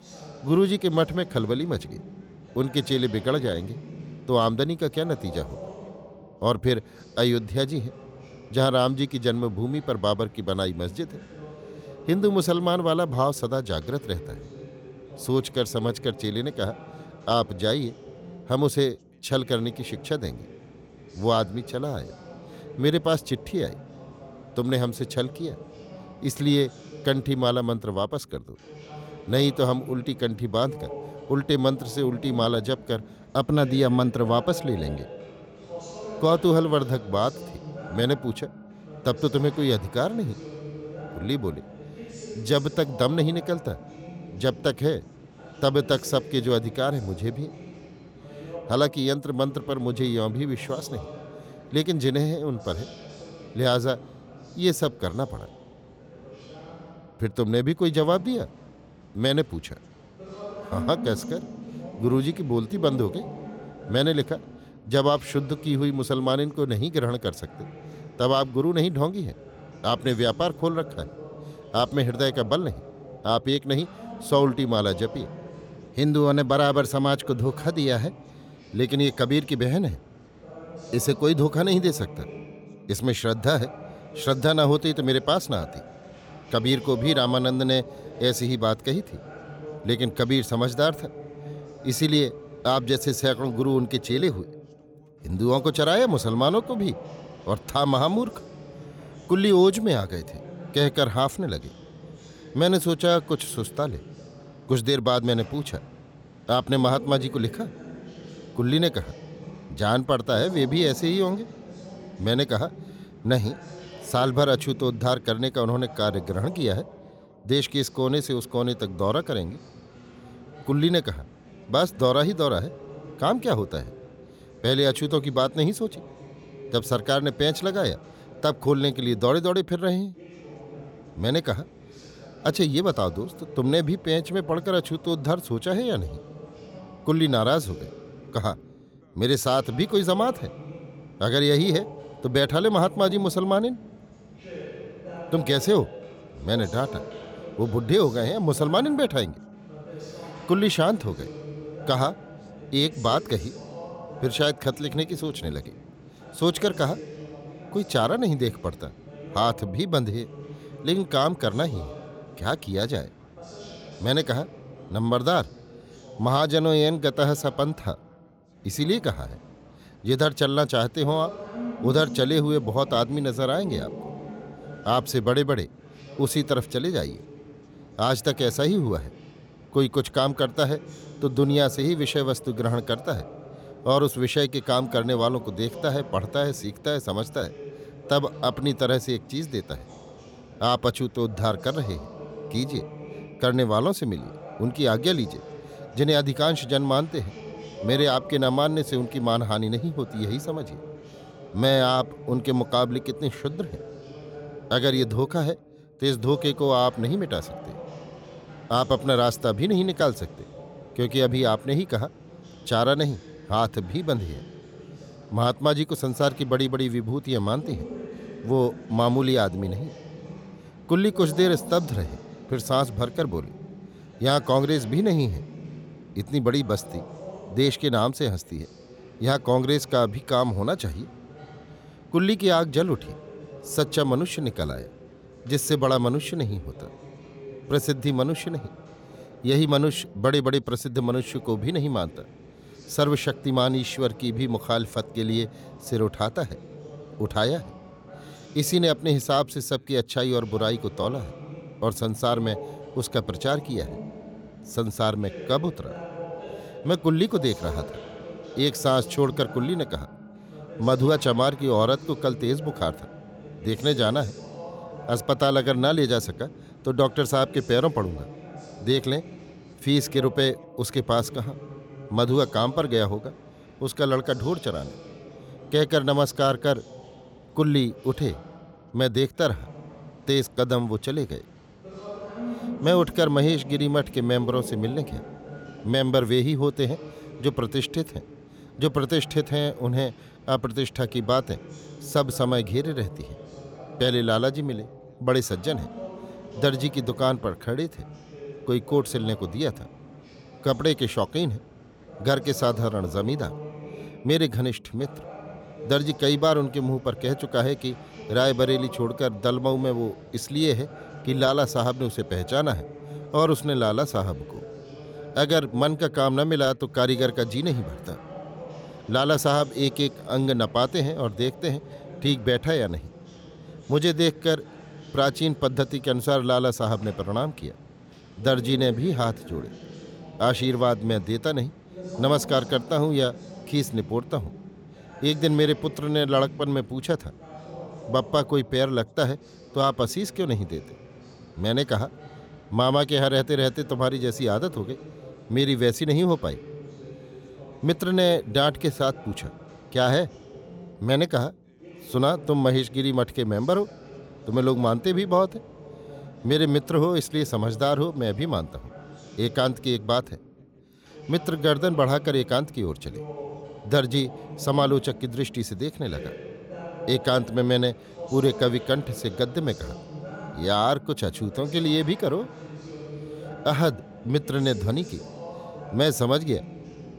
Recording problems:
background chatter; noticeable; throughout; 2 voices, 15 dB below the speech

